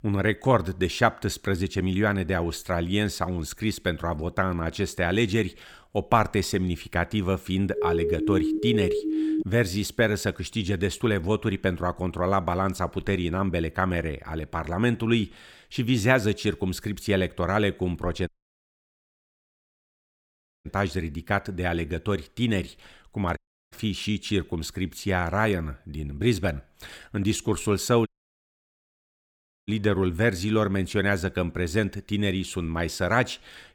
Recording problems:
siren; loud; from 7.5 to 9.5 s; peak 1 dB above the speech
audio cutting out; at 18 s for 2.5 s, at 23 s and at 28 s for 1.5 s

